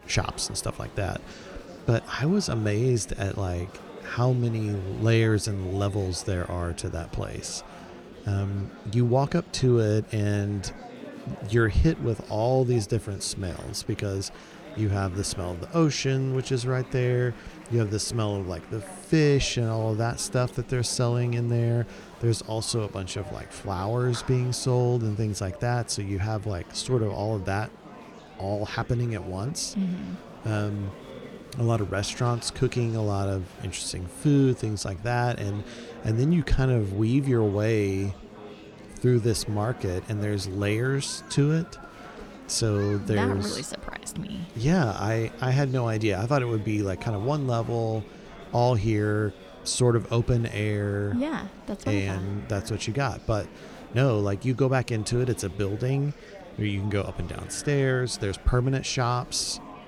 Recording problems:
murmuring crowd; noticeable; throughout; 20 dB below the speech

